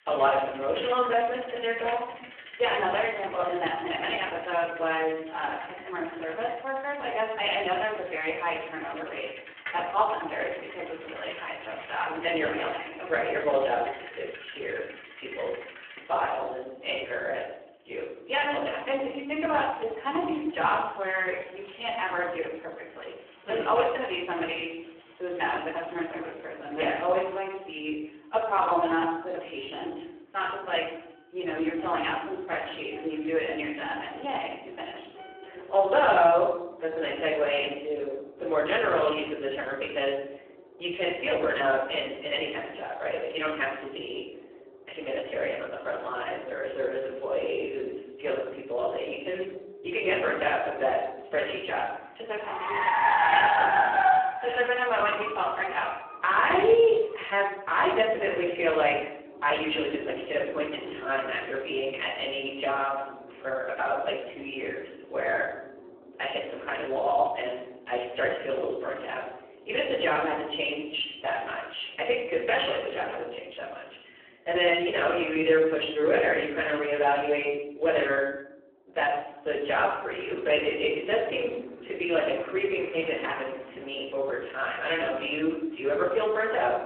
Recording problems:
phone-call audio; poor line
off-mic speech; far
room echo; noticeable; dies away in 0.7 s
traffic noise; loud; throughout; 6 dB below the speech

